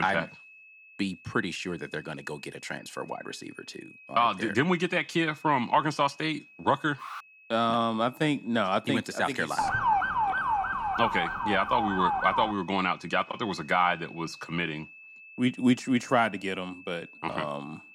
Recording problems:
high-pitched whine; faint; throughout; 2.5 kHz, 20 dB below the speech
abrupt cut into speech; at the start
alarm; faint; at 7 s; peak 15 dB below the speech
siren; loud; from 9.5 to 13 s; peak 3 dB above the speech

